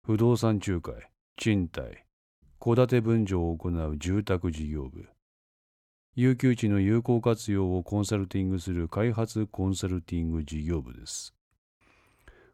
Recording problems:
none

